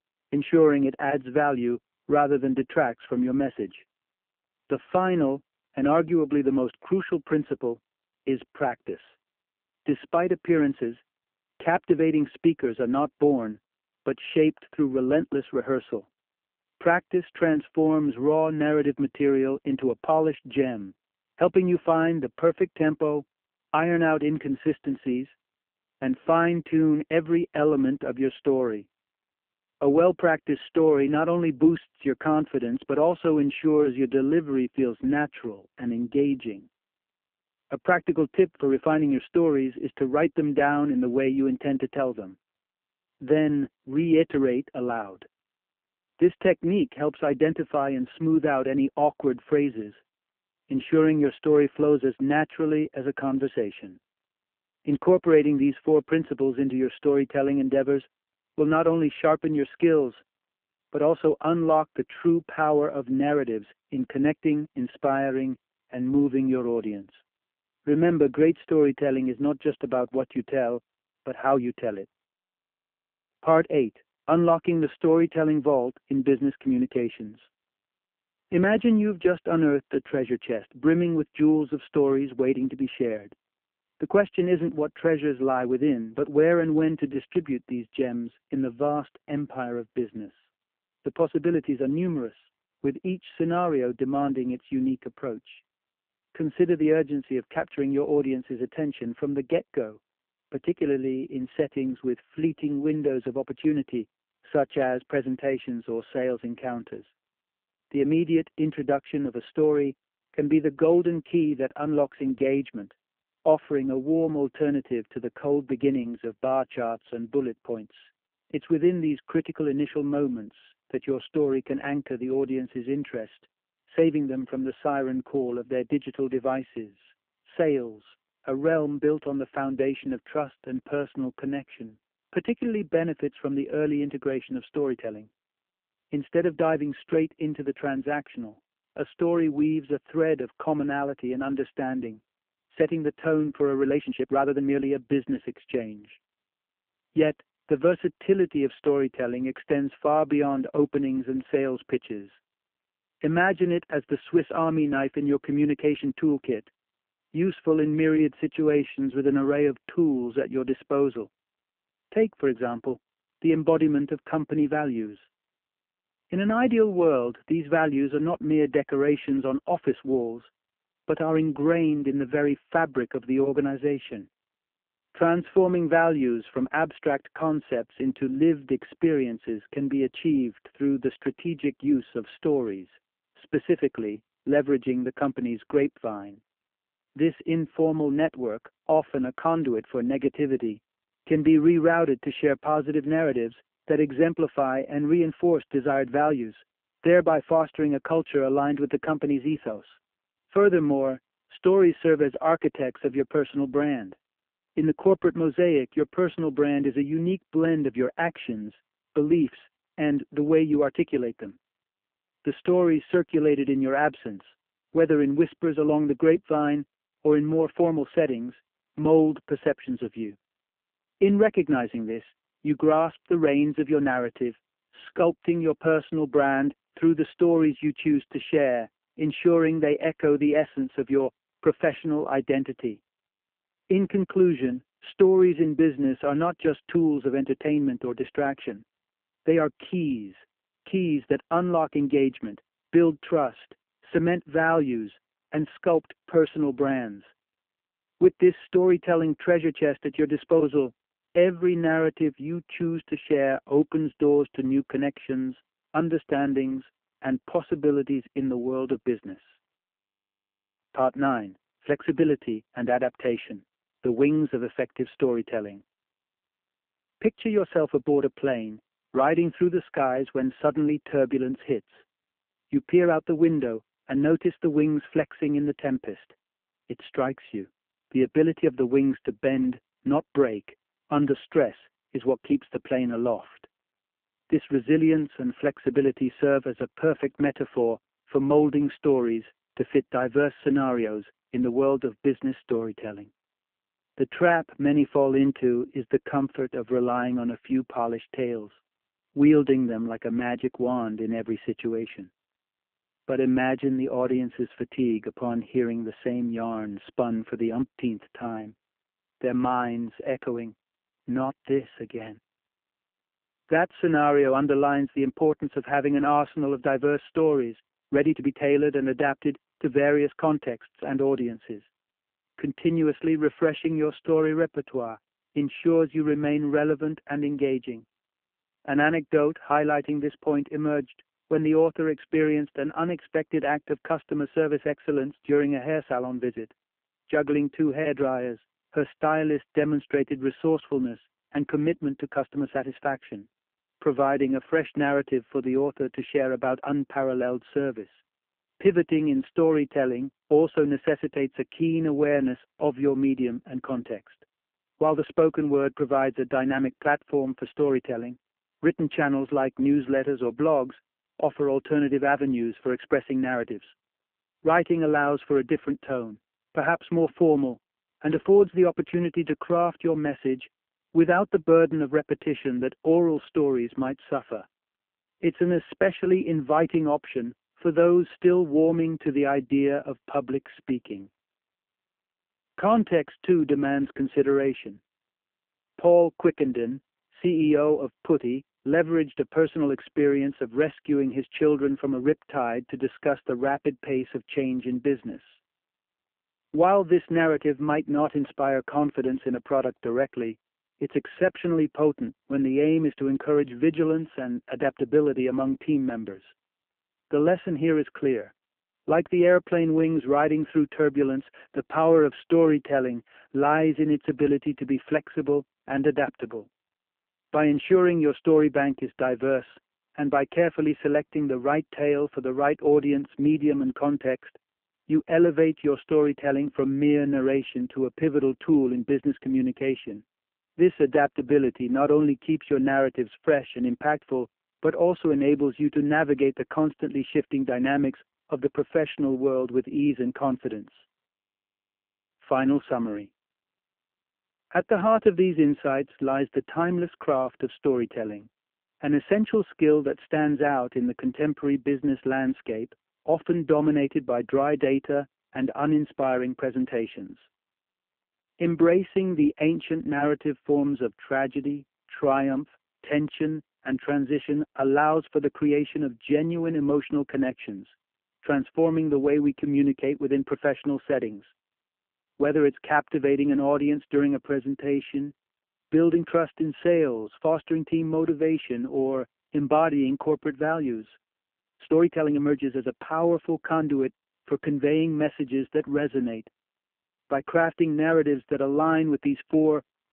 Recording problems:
phone-call audio; poor line
uneven, jittery; strongly; from 1:11 to 8:03

